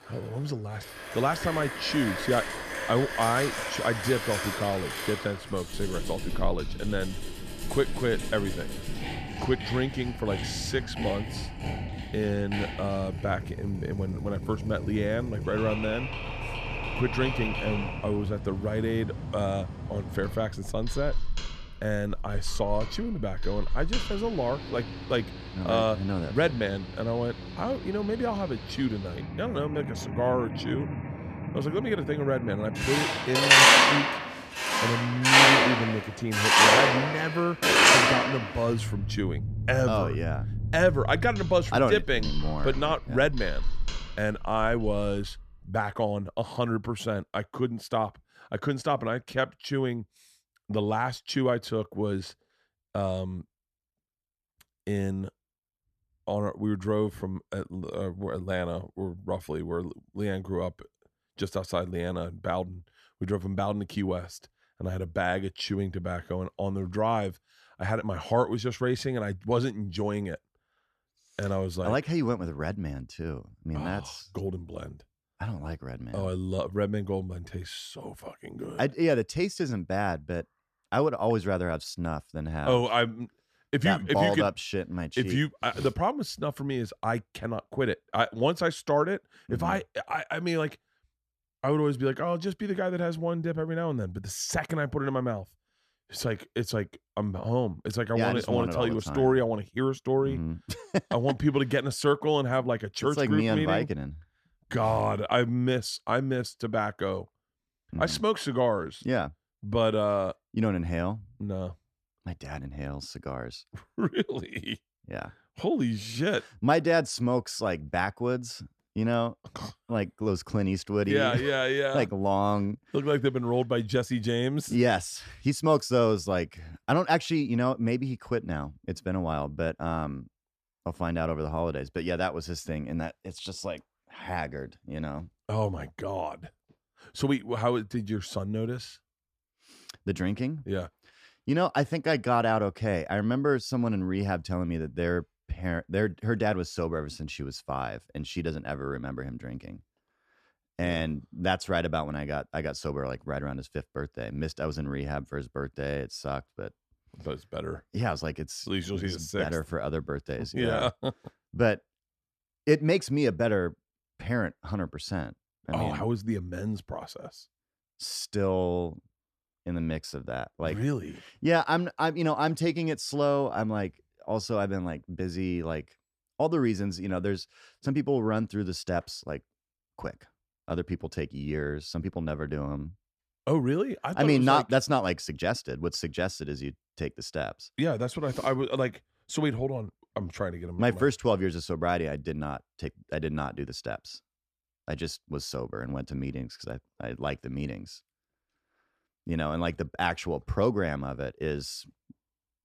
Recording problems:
machinery noise; very loud; until 45 s; 4 dB above the speech

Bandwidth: 14.5 kHz